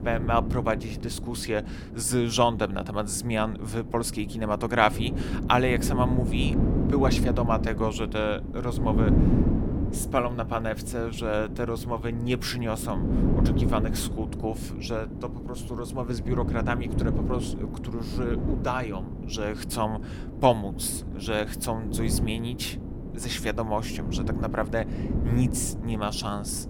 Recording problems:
wind noise on the microphone; heavy; 8 dB below the speech

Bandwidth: 17 kHz